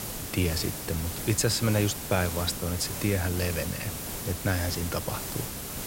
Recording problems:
hiss; loud; throughout; 5 dB below the speech

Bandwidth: 16 kHz